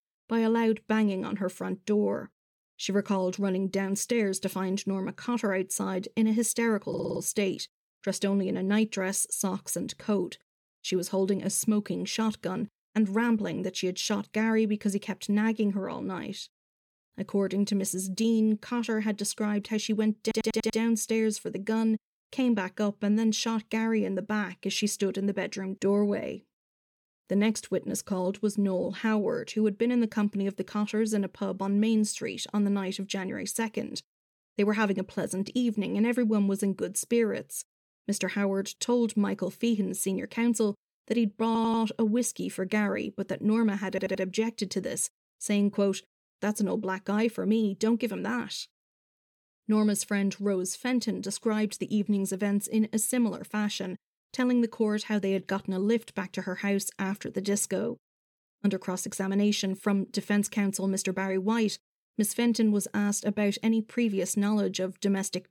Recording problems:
audio stuttering; 4 times, first at 7 s

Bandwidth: 18.5 kHz